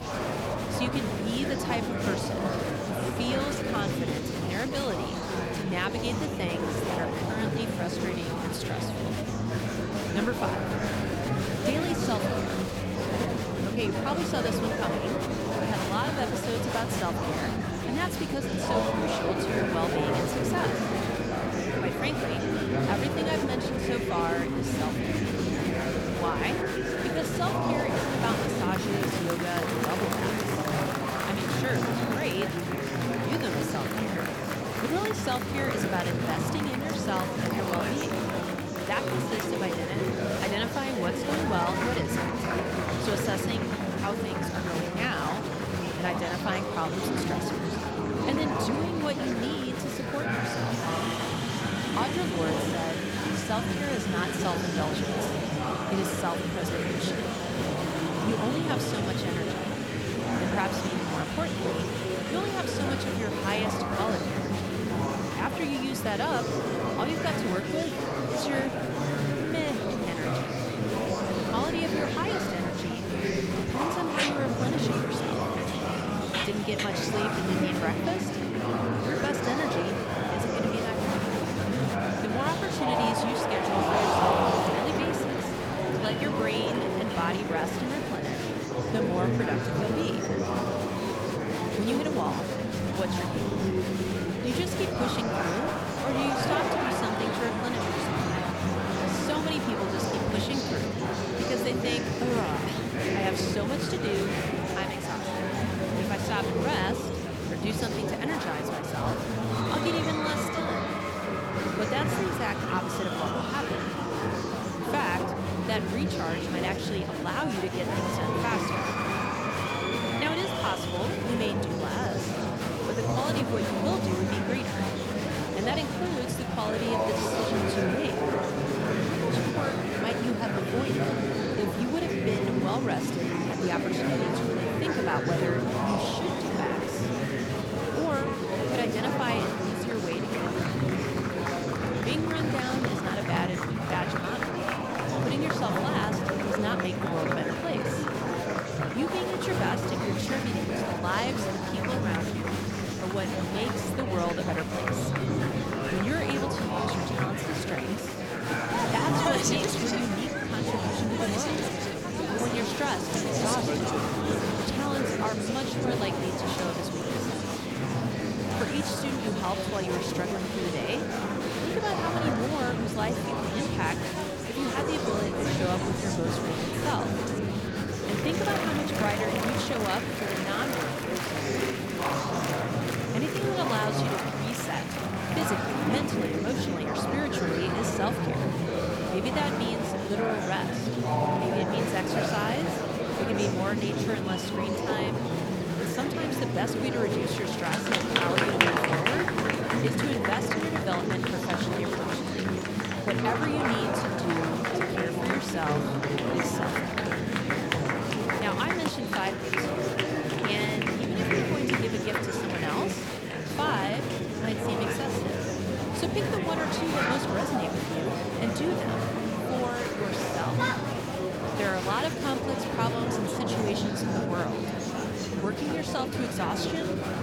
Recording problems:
murmuring crowd; very loud; throughout; 4 dB above the speech

